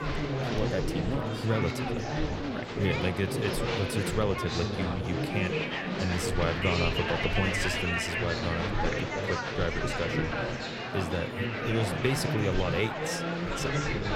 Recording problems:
murmuring crowd; very loud; throughout; 1 dB above the speech

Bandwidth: 16.5 kHz